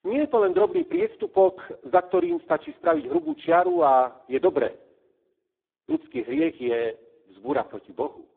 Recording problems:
phone-call audio; poor line; nothing above 3.5 kHz

